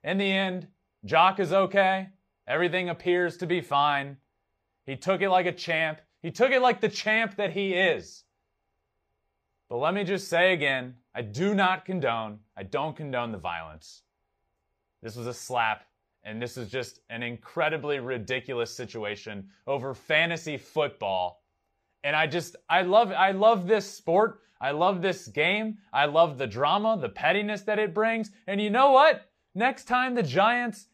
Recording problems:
none

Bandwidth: 15 kHz